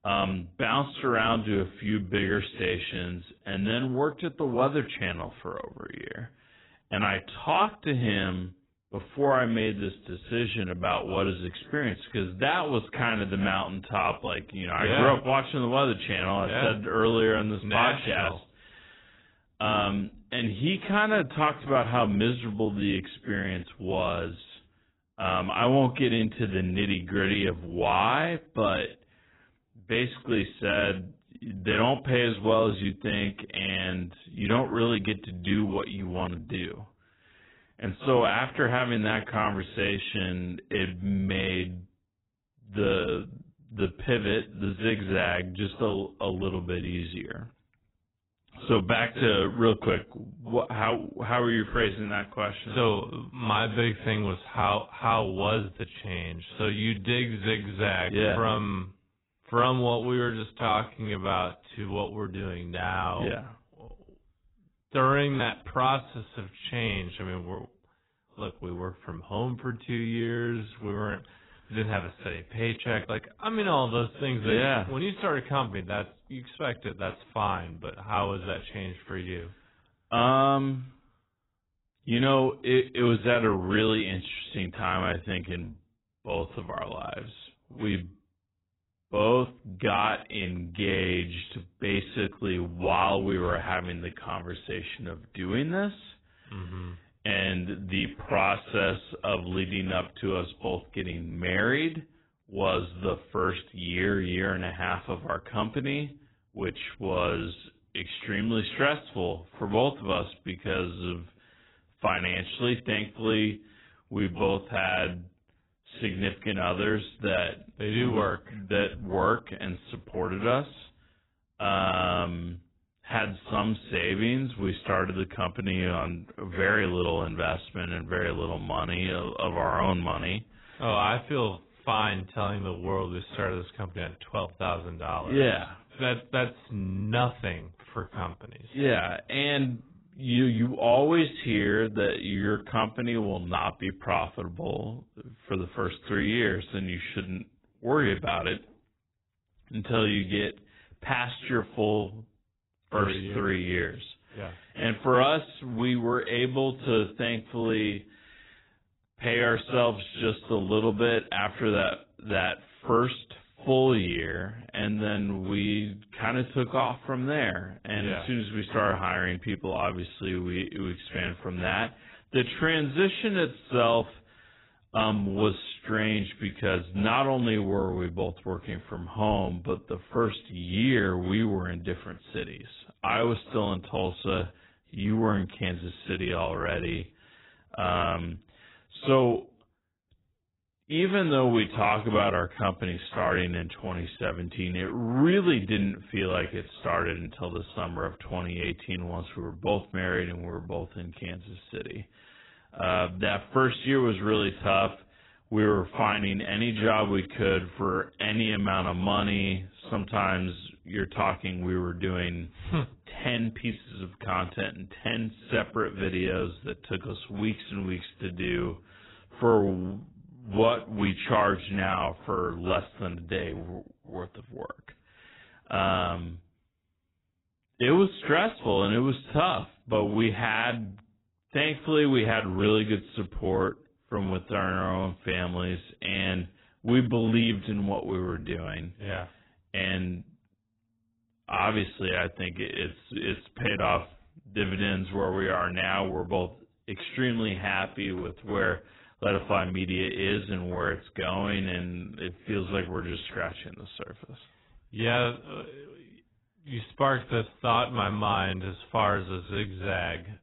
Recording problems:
garbled, watery; badly; nothing above 3.5 kHz
wrong speed, natural pitch; too slow; 0.7 times normal speed

